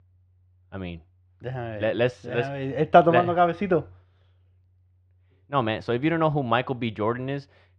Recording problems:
muffled; slightly; fading above 2.5 kHz

